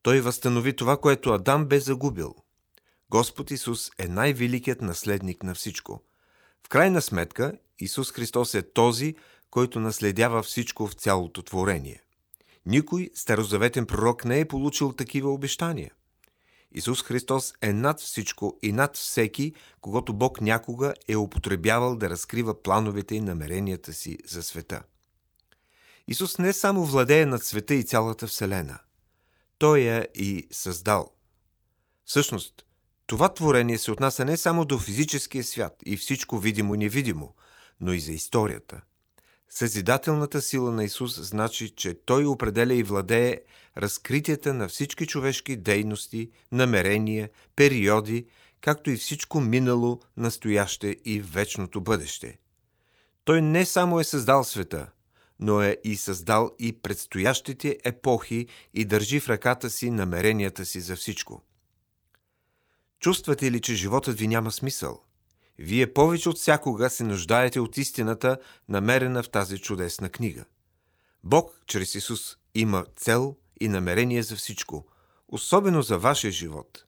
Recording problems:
none

